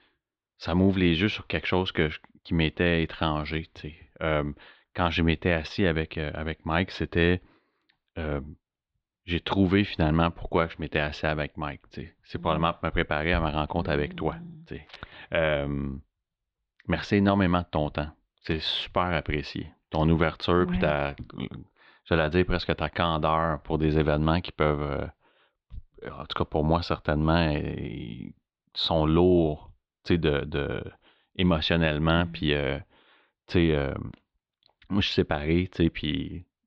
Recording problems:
muffled; slightly; fading above 4 kHz

